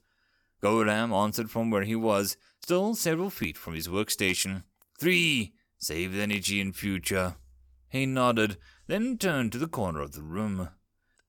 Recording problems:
none

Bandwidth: 18.5 kHz